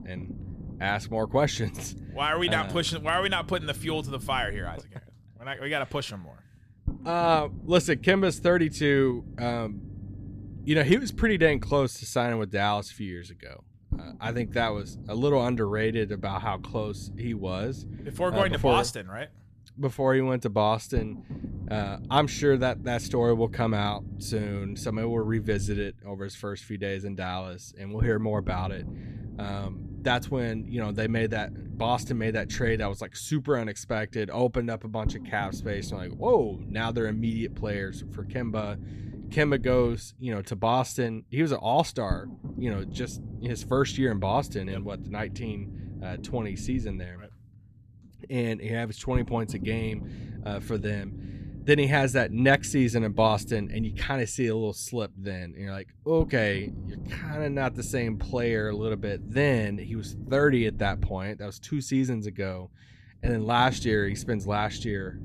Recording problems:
low rumble; faint; throughout; 20 dB below the speech

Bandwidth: 14.5 kHz